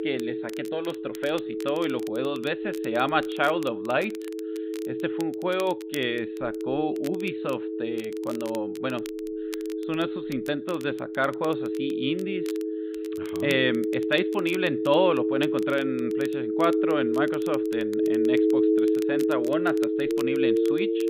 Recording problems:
high frequencies cut off; severe; nothing above 4 kHz
alarms or sirens; very loud; throughout; 1 dB above the speech
crackle, like an old record; noticeable; 20 dB below the speech

